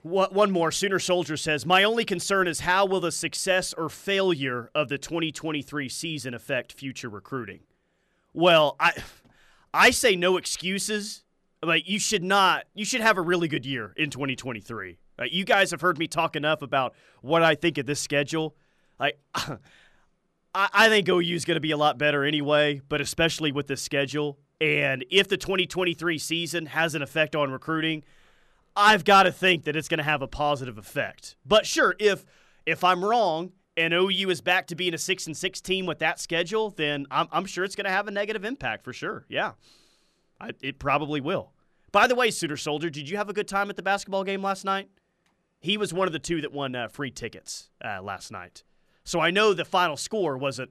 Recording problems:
none

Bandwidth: 13.5 kHz